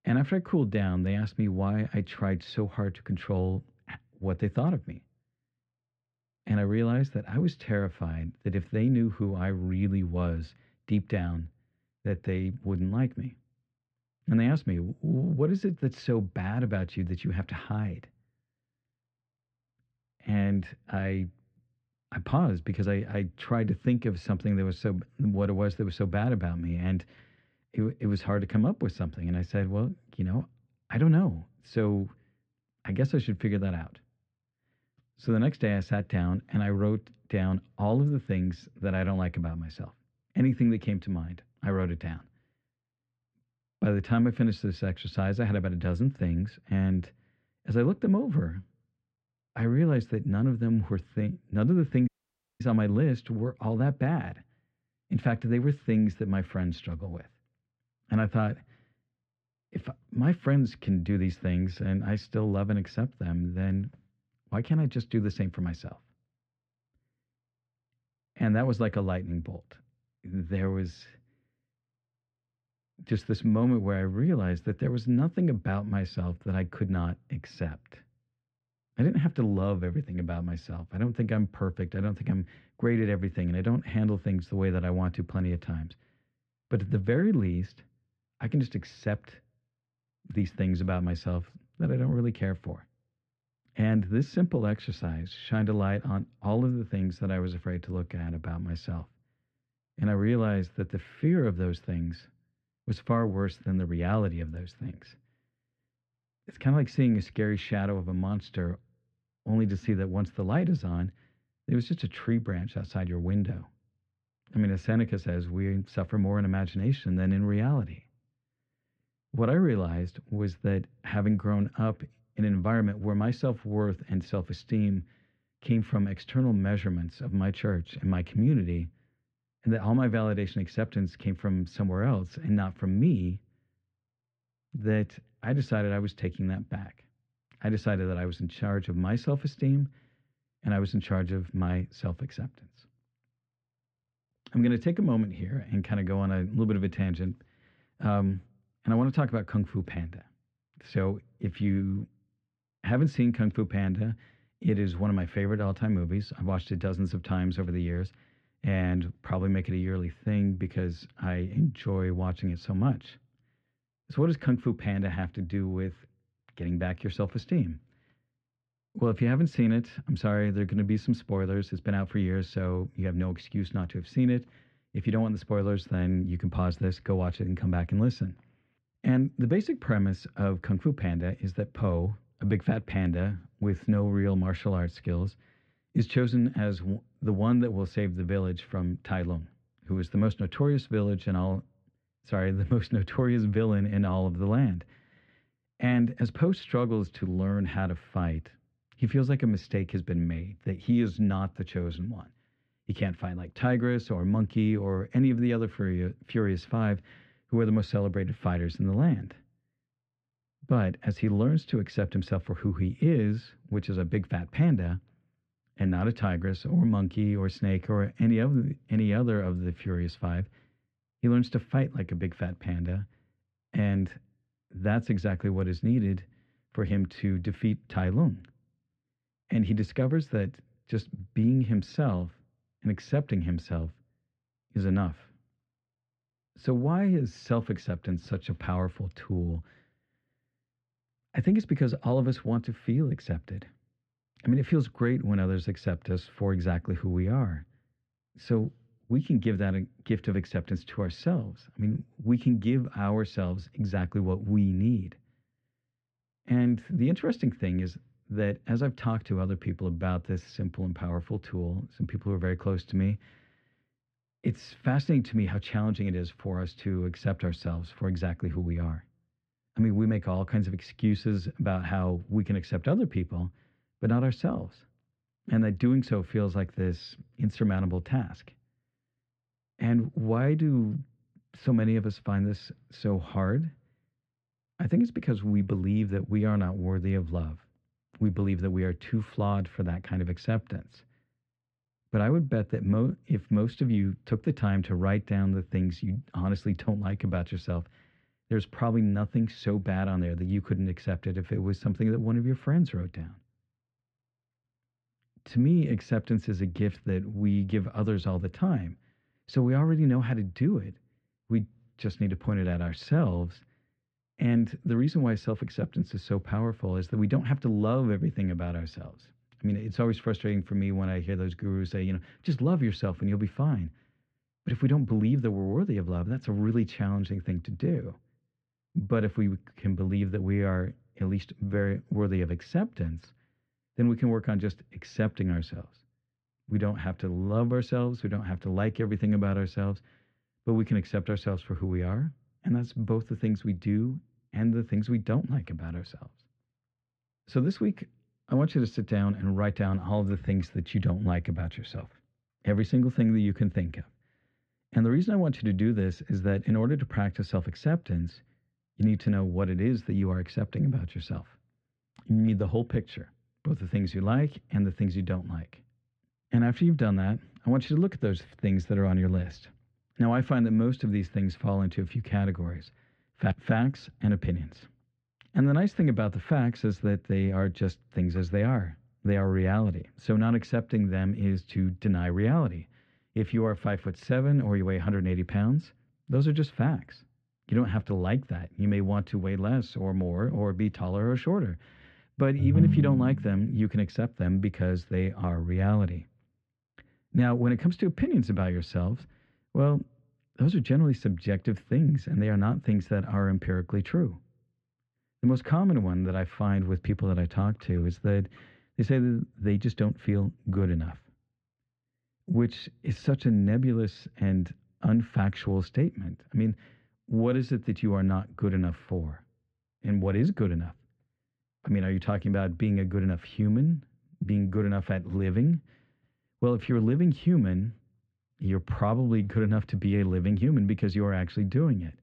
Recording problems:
muffled; slightly; fading above 3 kHz
audio cutting out; at 52 s for 0.5 s
phone ringing; loud; at 6:33; peak 6 dB above the speech

